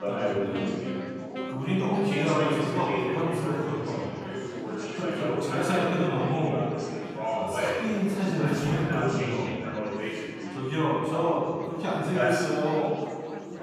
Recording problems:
room echo; strong; dies away in 1.7 s
off-mic speech; far
chatter from many people; loud; throughout; 3 dB below the speech
background music; noticeable; throughout; 15 dB below the speech

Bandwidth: 14.5 kHz